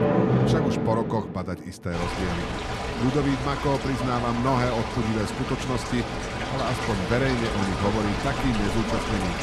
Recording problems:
rain or running water; loud; throughout; 1 dB below the speech

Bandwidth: 14 kHz